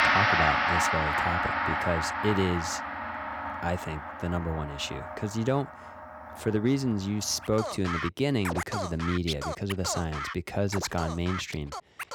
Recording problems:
background music; very loud; throughout; as loud as the speech

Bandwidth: 18 kHz